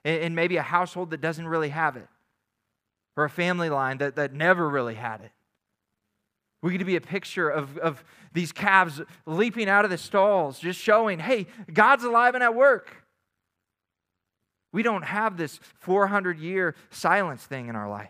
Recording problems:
muffled; very slightly; fading above 3 kHz

